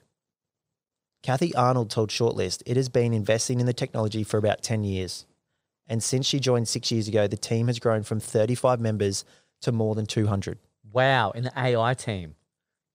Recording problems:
none

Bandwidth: 15.5 kHz